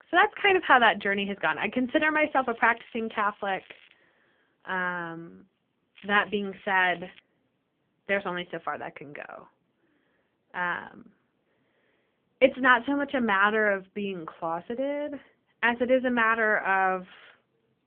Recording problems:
phone-call audio; poor line; nothing above 3 kHz
crackling; faint; from 2.5 to 4 s and from 6 to 7 s; 30 dB below the speech

